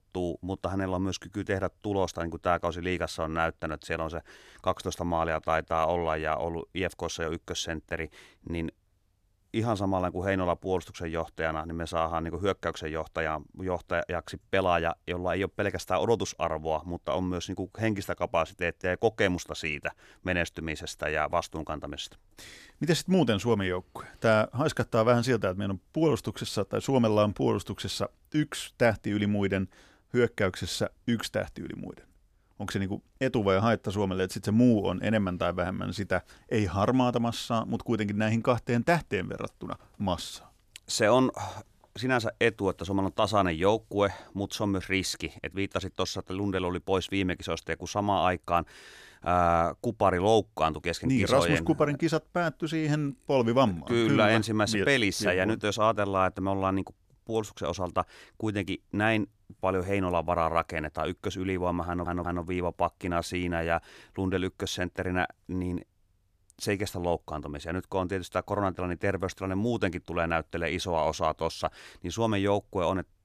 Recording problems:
audio stuttering; at 1:02

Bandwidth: 14.5 kHz